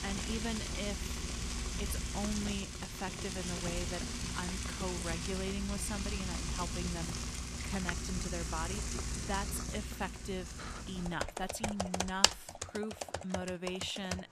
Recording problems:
household noises; very loud; throughout; 3 dB above the speech

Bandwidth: 14.5 kHz